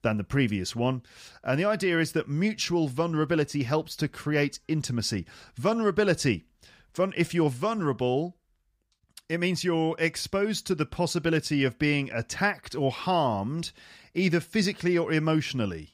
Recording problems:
none

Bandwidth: 15 kHz